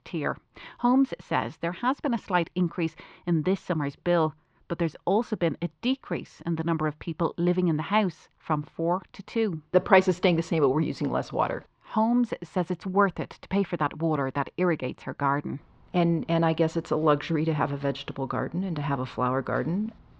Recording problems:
muffled; very; fading above 4 kHz

